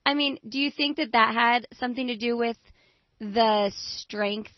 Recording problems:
garbled, watery; slightly; nothing above 5 kHz

